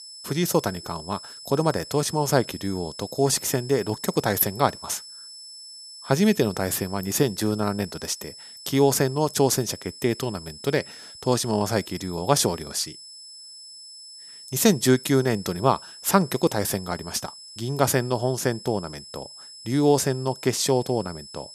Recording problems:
high-pitched whine; noticeable; throughout; 5.5 kHz, 15 dB below the speech

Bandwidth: 14 kHz